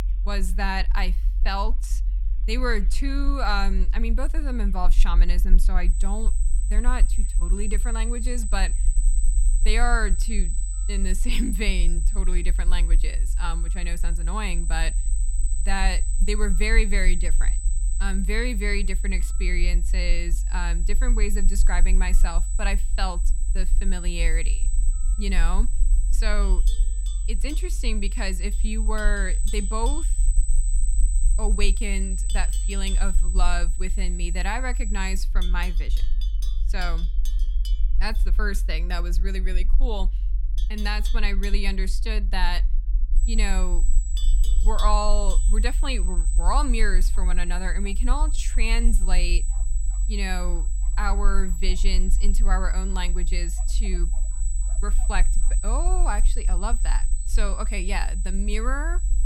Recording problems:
high-pitched whine; loud; from 6 to 35 s and from 43 s on; 8 kHz, 6 dB below the speech
animal sounds; noticeable; throughout; 15 dB below the speech
low rumble; faint; throughout; 20 dB below the speech

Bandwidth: 16.5 kHz